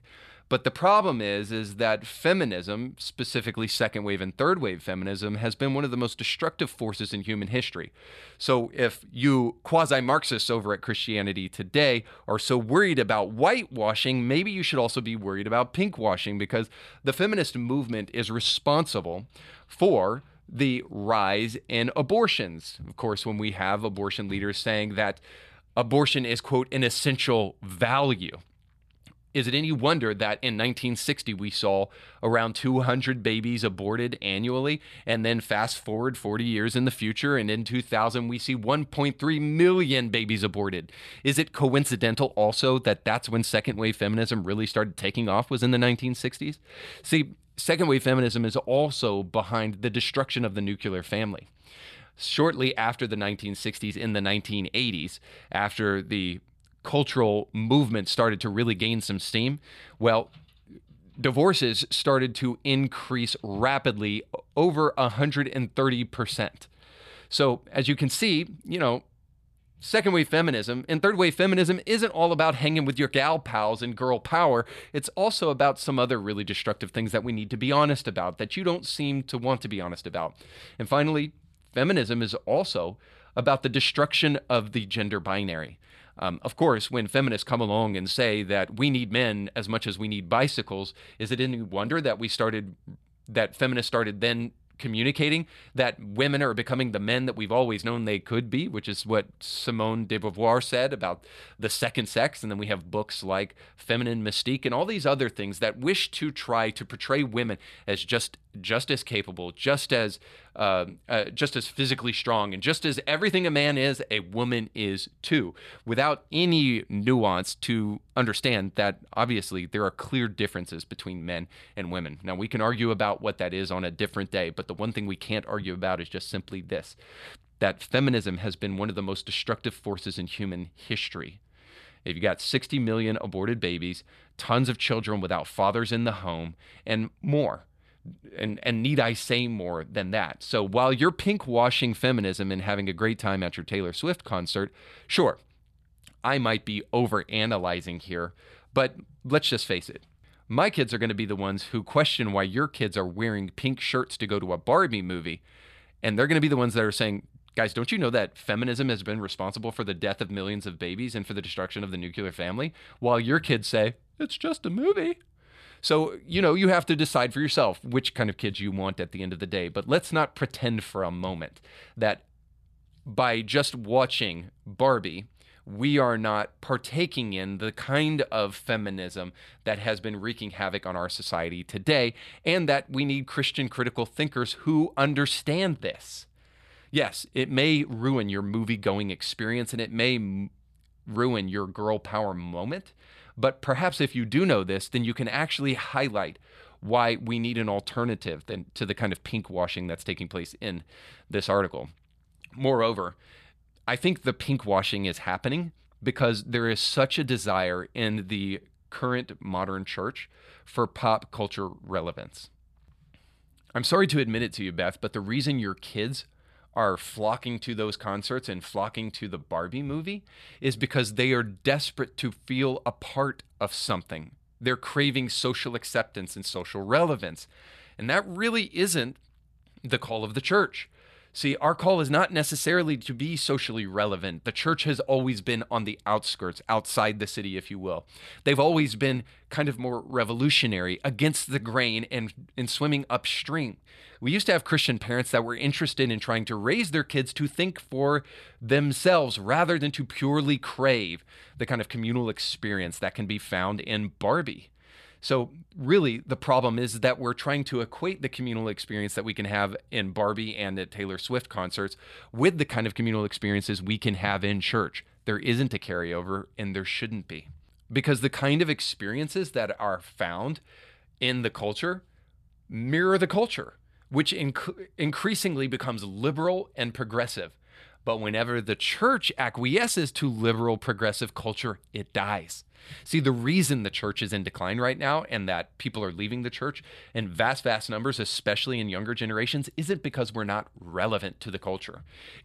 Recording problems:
none

